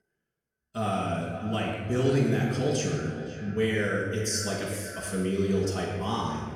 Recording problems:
off-mic speech; far
echo of what is said; noticeable; throughout; 510 ms later, 15 dB below the speech
room echo; noticeable; dies away in 1.3 s

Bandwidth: 18.5 kHz